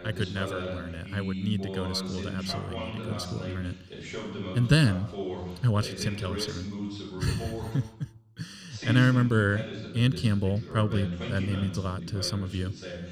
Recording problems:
voice in the background; loud; throughout; 8 dB below the speech

